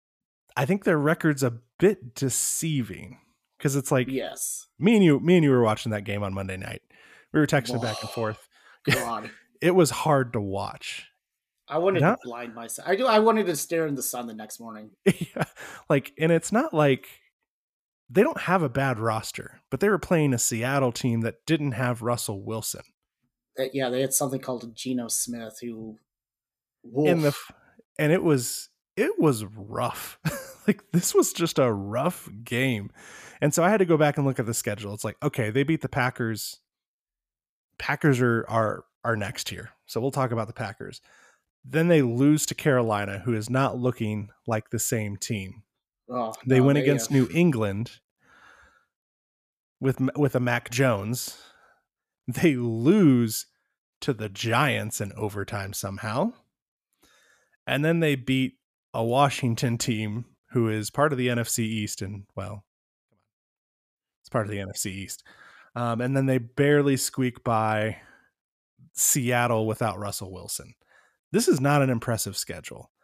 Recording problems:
none

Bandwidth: 14.5 kHz